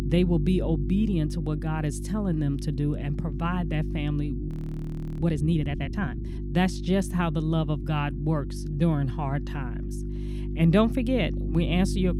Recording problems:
electrical hum; noticeable; throughout; 50 Hz, 10 dB below the speech
audio freezing; at 4.5 s for 0.5 s

